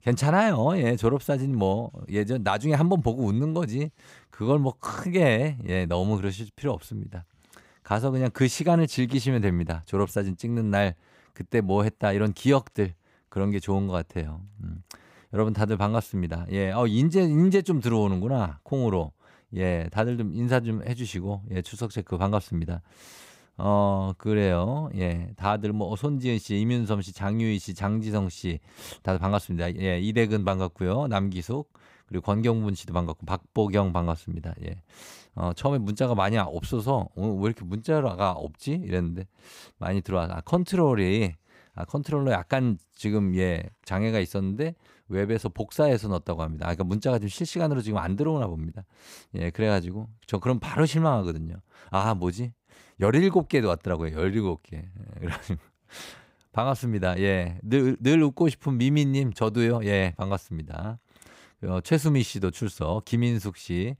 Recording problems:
none

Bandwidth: 15.5 kHz